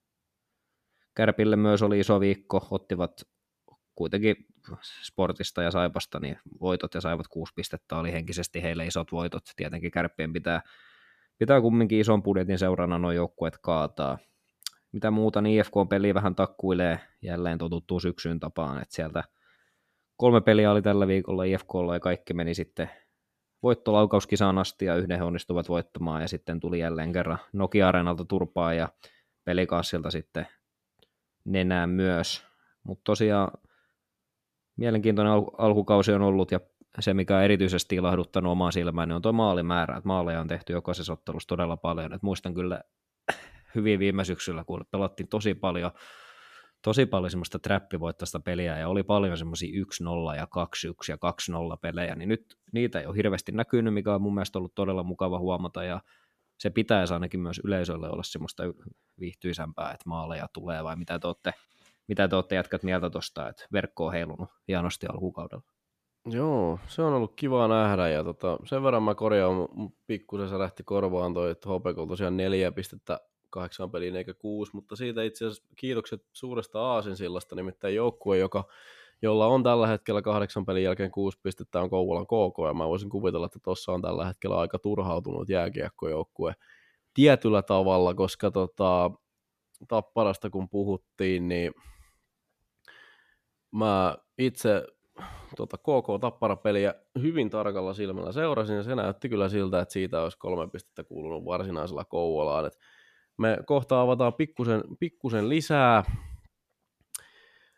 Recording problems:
none

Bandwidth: 14.5 kHz